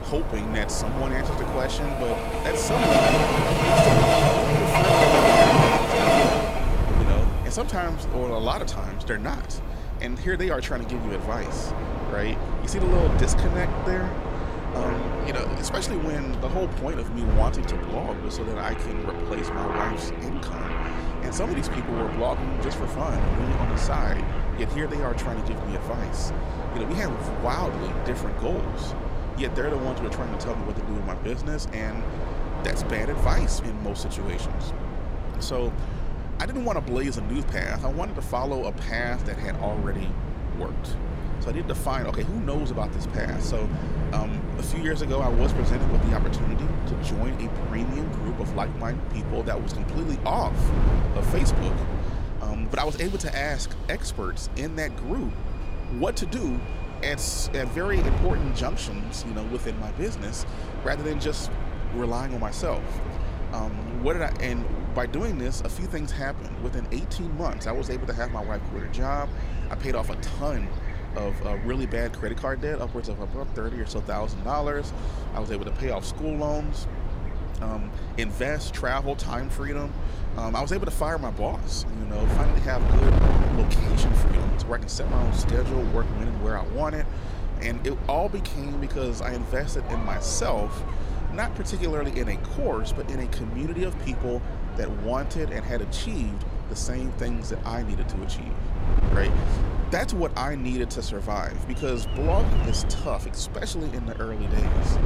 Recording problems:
train or aircraft noise; very loud; throughout; 3 dB above the speech
wind noise on the microphone; heavy; 8 dB below the speech

